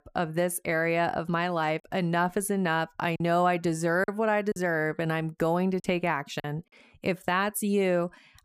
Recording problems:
choppy; occasionally; 3% of the speech affected

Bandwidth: 15 kHz